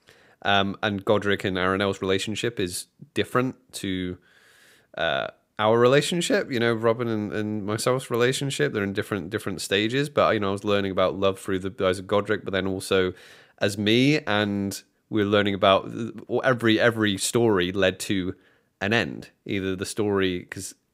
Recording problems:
none

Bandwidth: 15.5 kHz